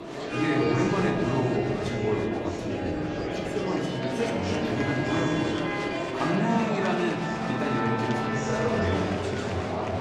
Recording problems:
room echo; noticeable; dies away in 1.4 s
off-mic speech; somewhat distant
background music; loud; throughout; 3 dB below the speech
murmuring crowd; loud; throughout; 2 dB below the speech

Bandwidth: 14 kHz